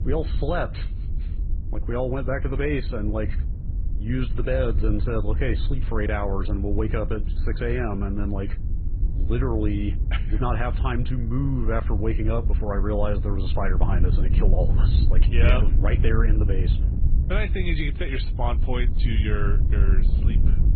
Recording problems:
garbled, watery; badly; nothing above 4 kHz
wind noise on the microphone; occasional gusts; 10 dB below the speech

